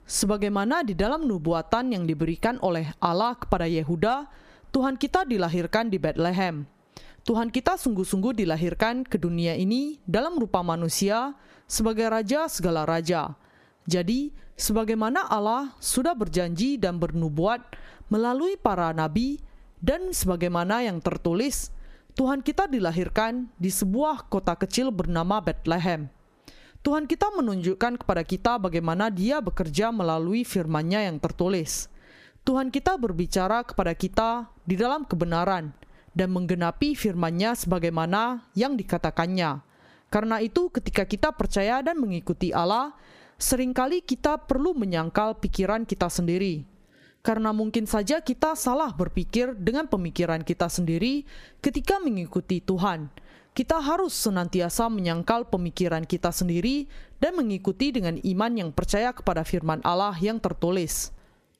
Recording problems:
squashed, flat; somewhat

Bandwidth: 15 kHz